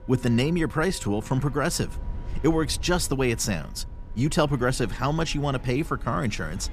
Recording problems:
background music; faint; throughout; 25 dB below the speech
low rumble; faint; throughout; 25 dB below the speech

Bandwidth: 14.5 kHz